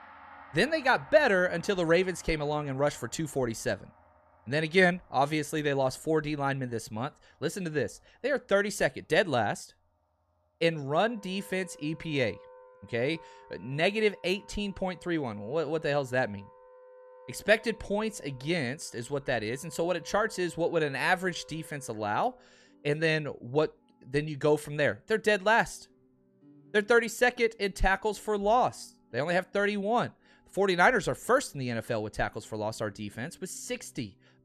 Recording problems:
background music; faint; throughout; 25 dB below the speech

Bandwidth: 13.5 kHz